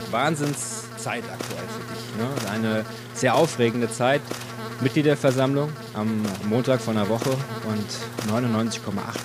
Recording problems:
electrical hum; loud; throughout; 60 Hz, 9 dB below the speech

